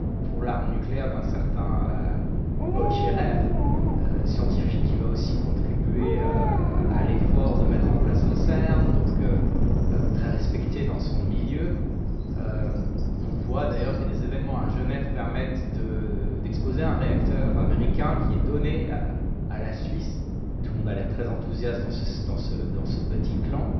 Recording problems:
off-mic speech; far
room echo; noticeable; dies away in 1 s
high frequencies cut off; noticeable; nothing above 5.5 kHz
wind noise on the microphone; heavy; as loud as the speech
animal sounds; loud; throughout; 2 dB below the speech

